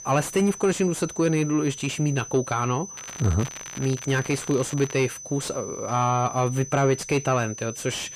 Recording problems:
distortion; slight; 10 dB below the speech
high-pitched whine; noticeable; throughout; 6 kHz, 10 dB below the speech
crackling; noticeable; from 3 to 5 s; 15 dB below the speech

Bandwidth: 15 kHz